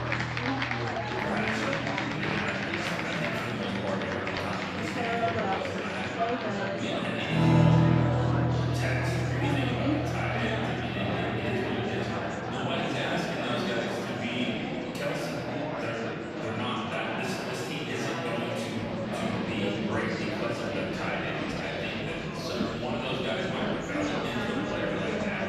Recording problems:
room echo; strong; dies away in 2.6 s
off-mic speech; far
background music; very loud; throughout; 4 dB above the speech
chatter from many people; very loud; throughout; 1 dB above the speech

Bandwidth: 14 kHz